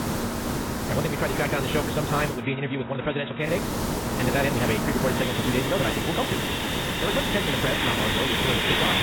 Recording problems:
garbled, watery; badly; nothing above 4 kHz
wrong speed, natural pitch; too fast; 1.7 times normal speed
machinery noise; loud; throughout; 2 dB below the speech
hiss; loud; until 2.5 s and from 3.5 s on; as loud as the speech
abrupt cut into speech; at the end

